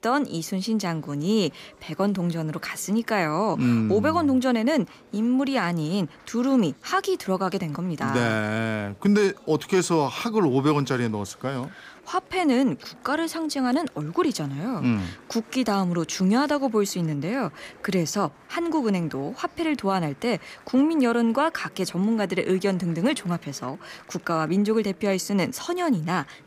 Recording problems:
murmuring crowd; faint; throughout; 25 dB below the speech

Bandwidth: 15 kHz